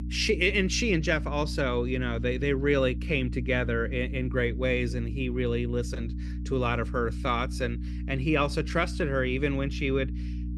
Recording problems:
electrical hum; noticeable; throughout; 60 Hz, 15 dB below the speech

